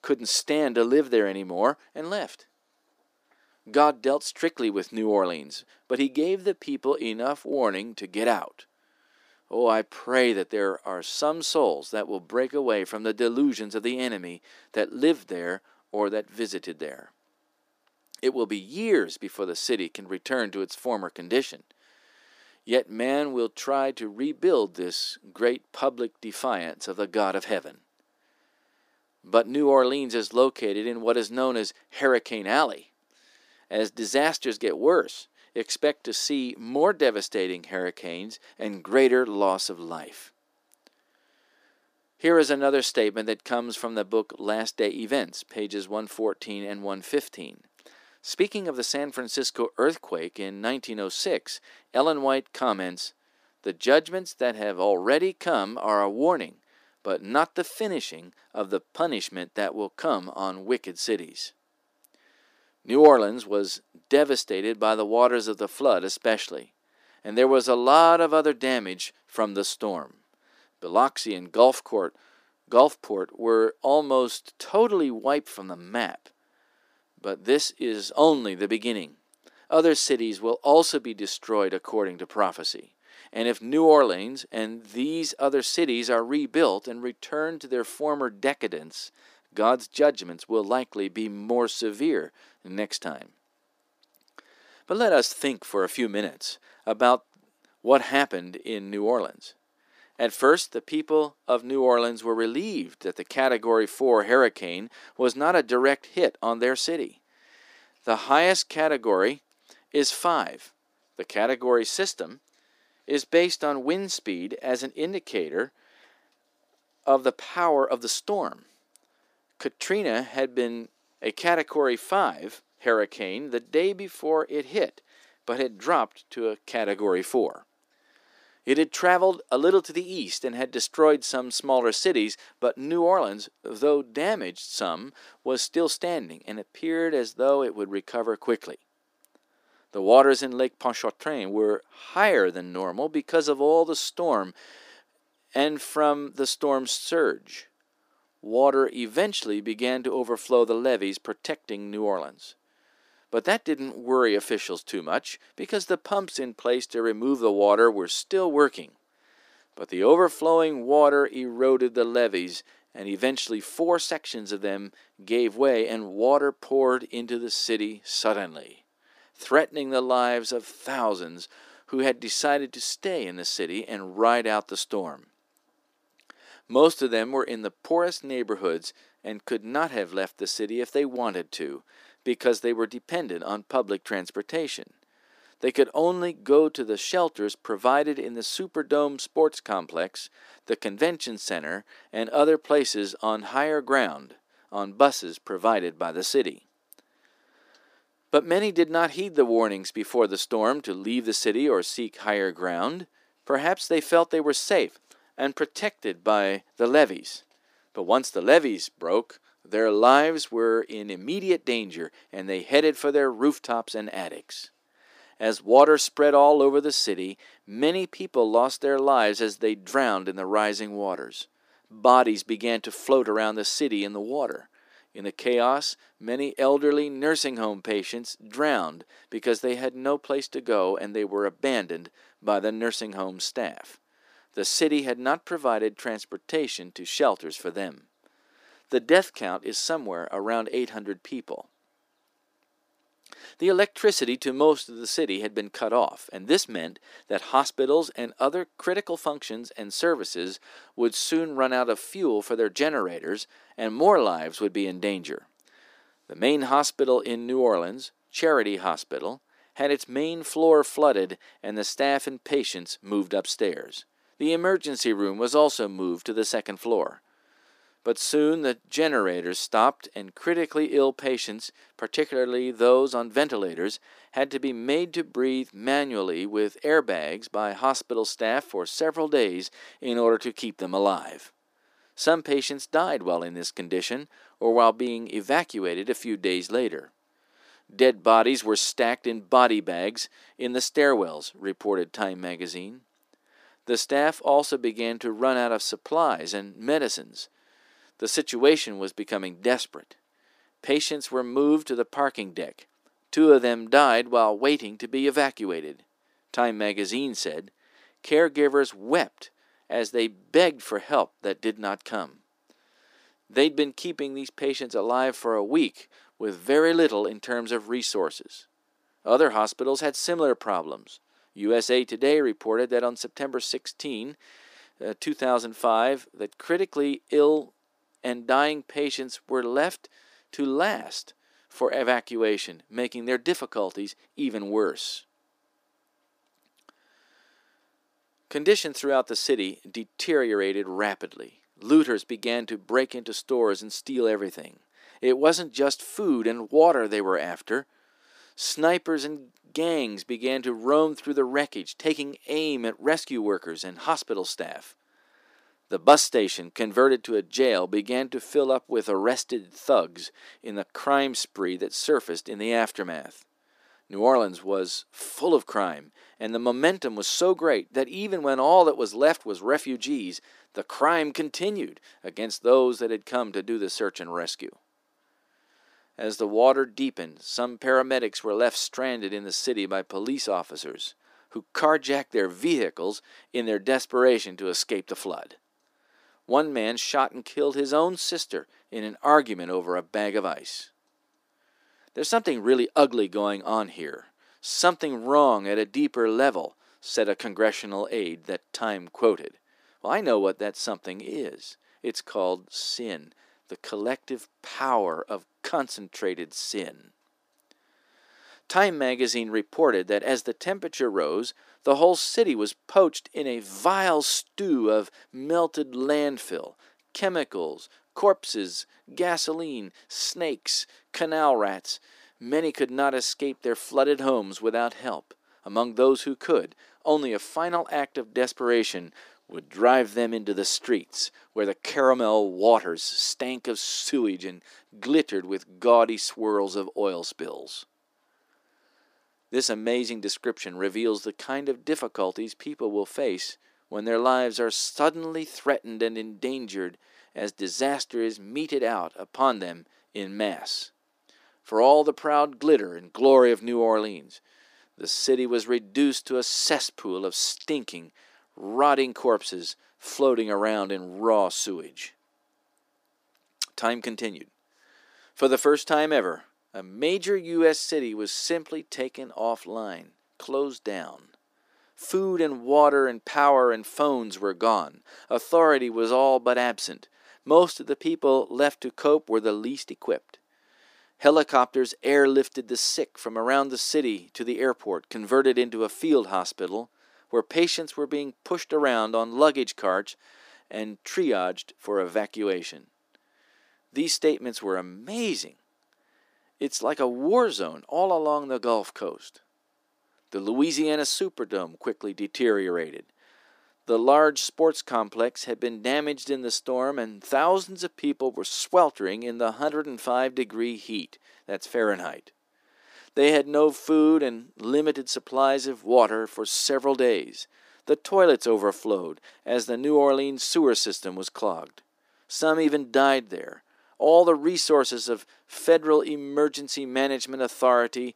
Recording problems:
thin; very slightly; fading below 300 Hz

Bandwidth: 15 kHz